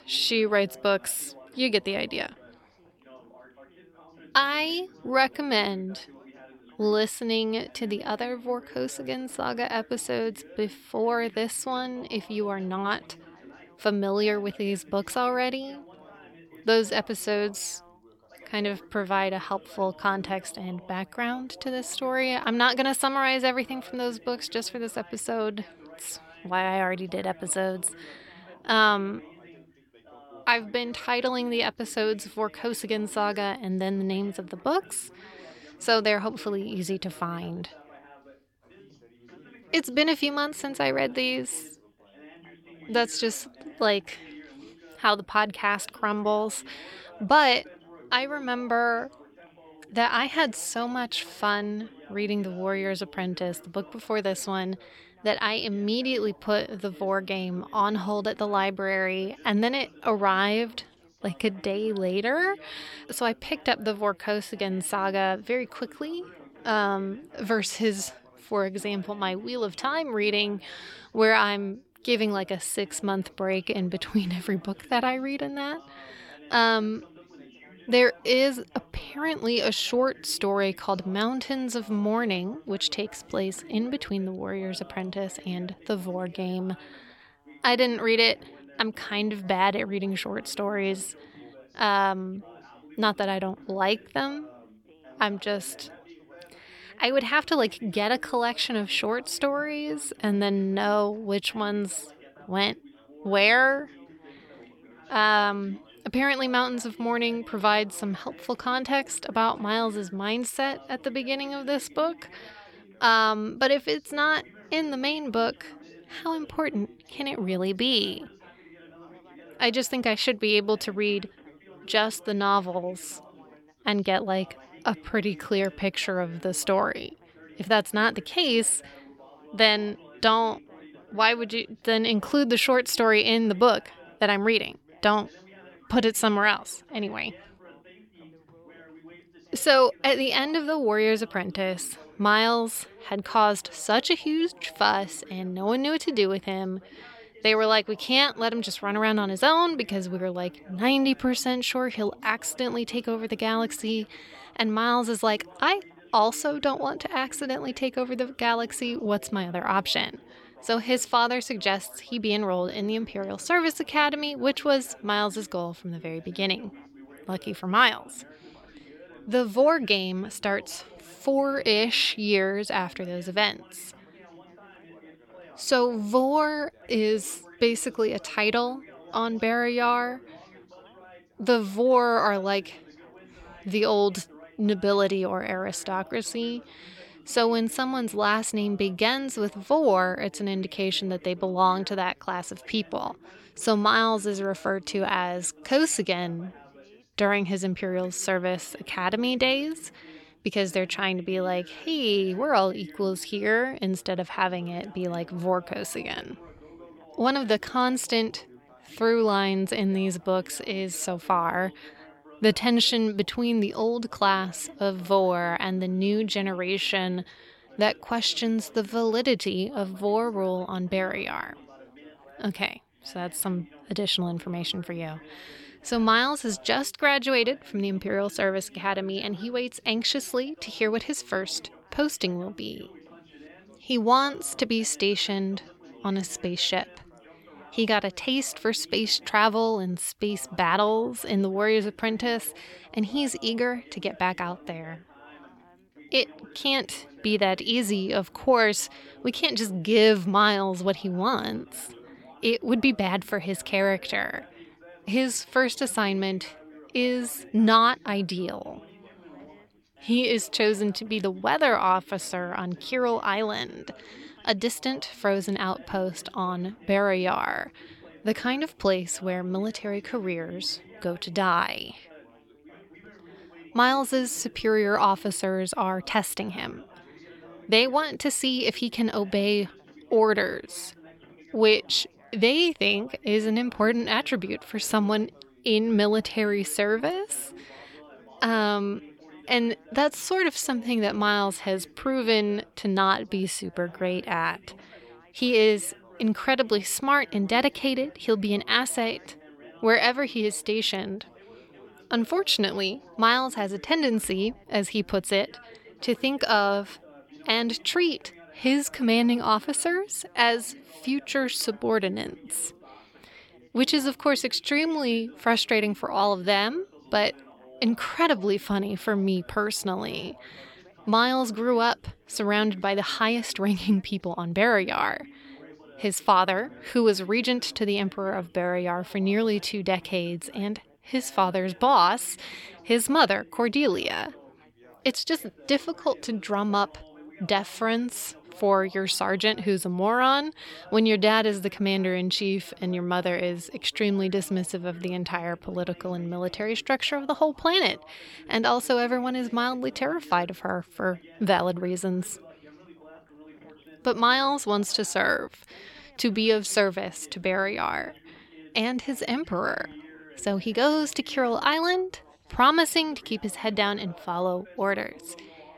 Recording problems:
background chatter; faint; throughout; 3 voices, 25 dB below the speech

